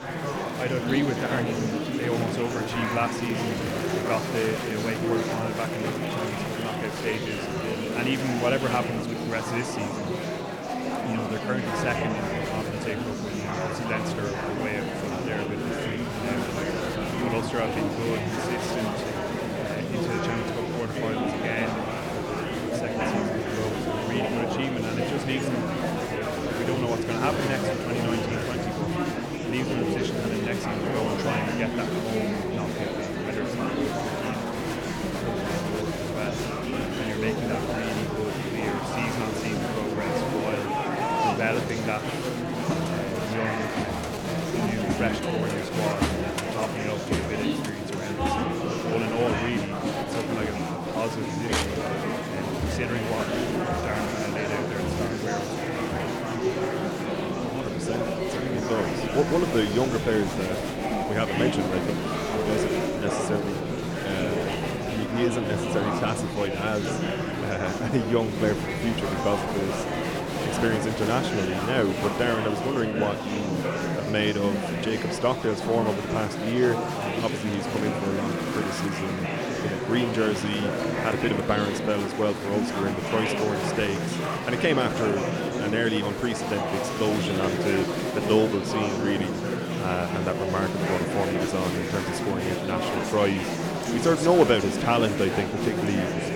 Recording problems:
murmuring crowd; very loud; throughout; 1 dB above the speech

